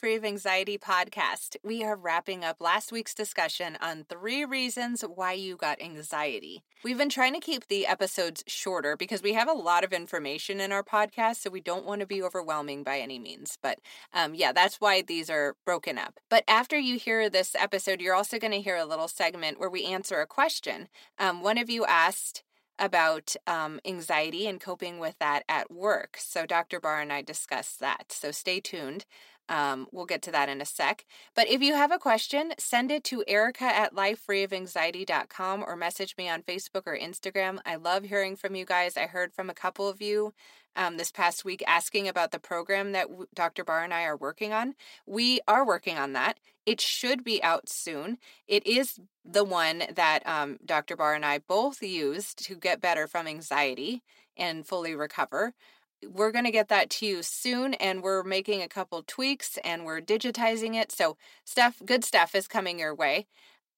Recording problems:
thin; very slightly; fading below 300 Hz

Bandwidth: 16 kHz